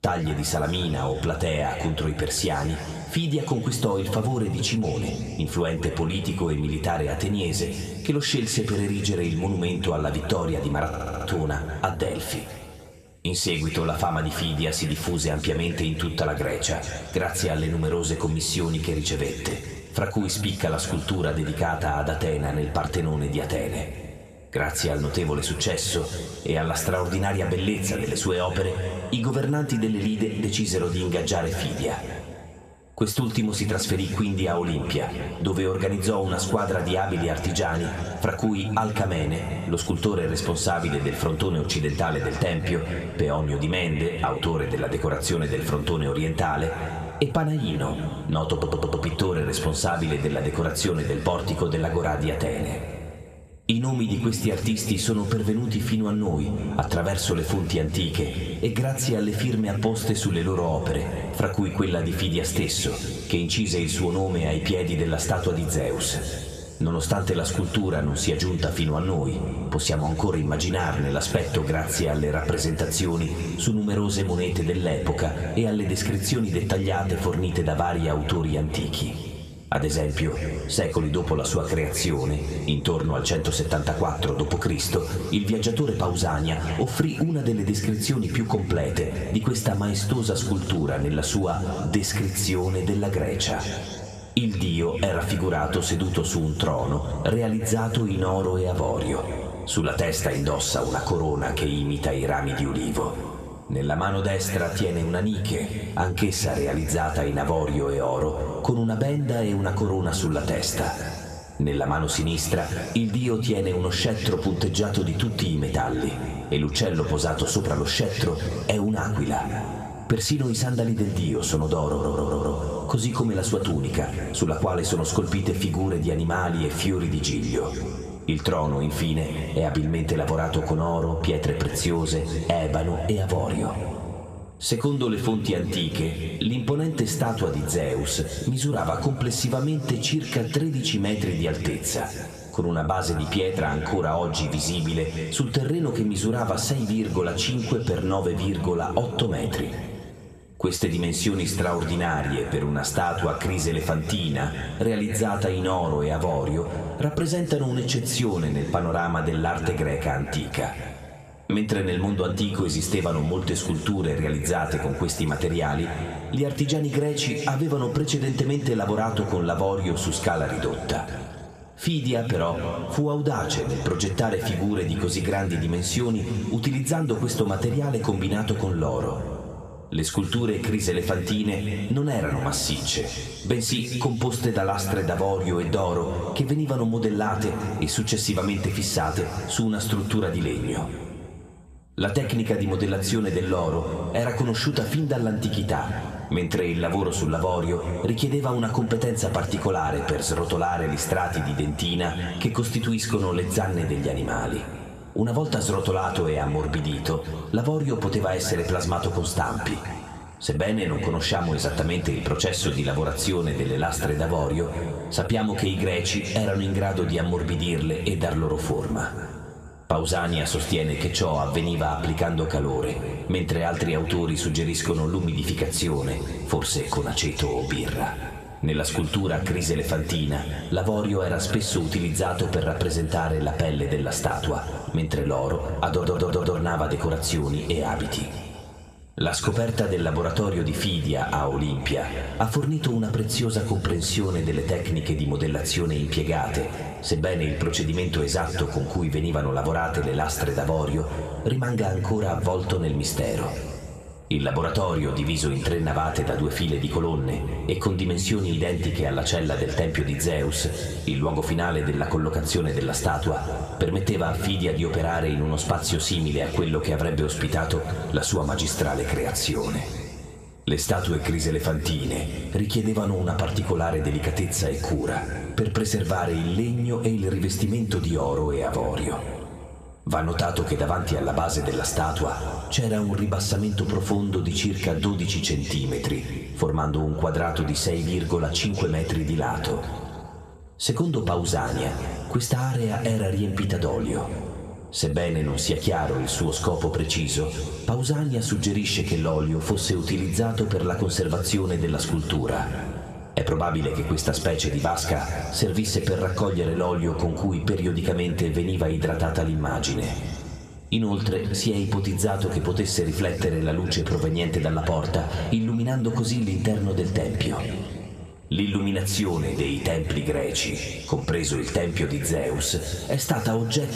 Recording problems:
room echo; slight; dies away in 2 s
off-mic speech; somewhat distant
squashed, flat; somewhat
audio stuttering; 4 times, first at 11 s

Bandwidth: 14.5 kHz